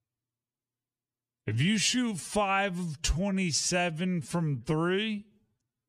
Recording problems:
wrong speed, natural pitch; too slow; 0.6 times normal speed

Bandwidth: 15 kHz